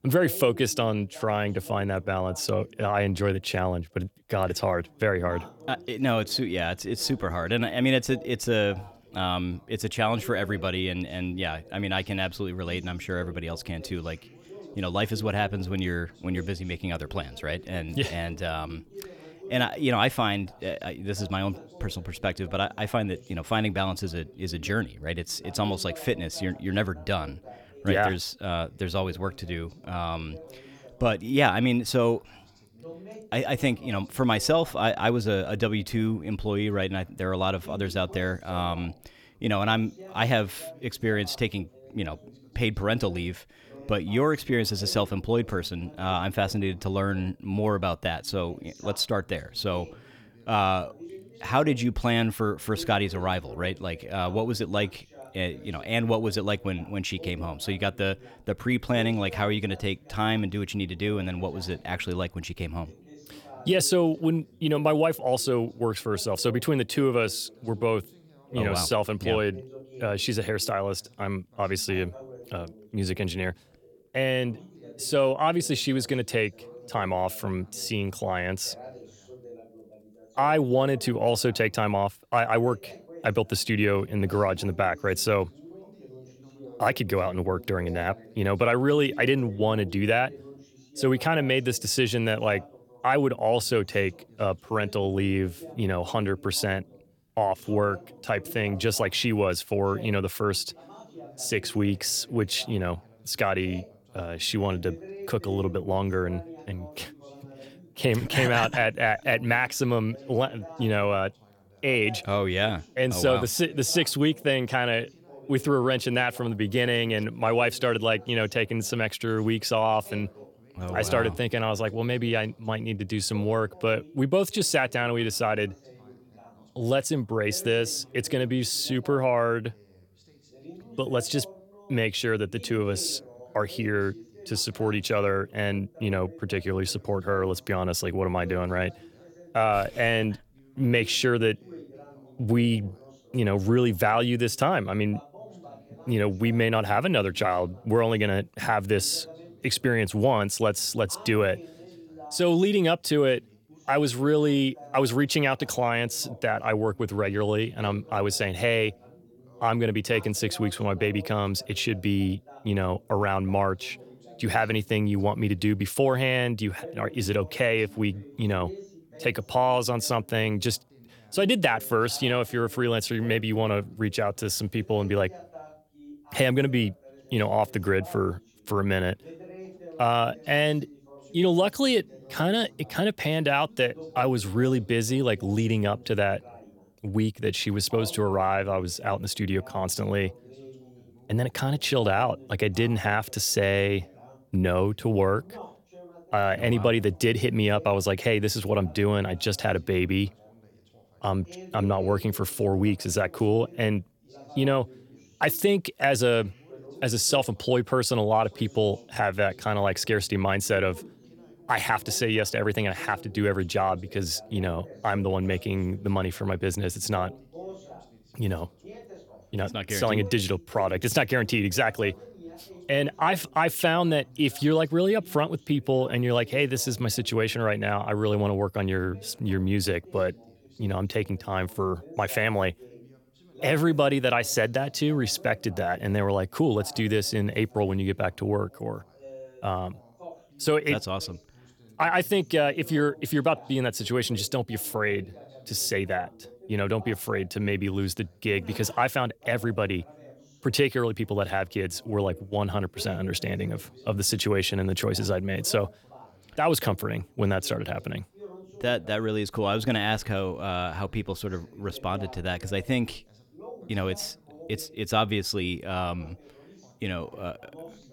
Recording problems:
background chatter; faint; throughout; 2 voices, 20 dB below the speech

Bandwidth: 17.5 kHz